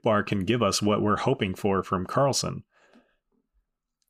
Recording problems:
none

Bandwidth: 15 kHz